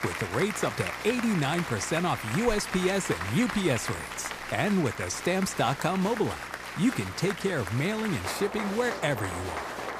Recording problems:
crowd noise; loud; throughout; 6 dB below the speech
electrical hum; faint; throughout; 60 Hz, 25 dB below the speech

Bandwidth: 15 kHz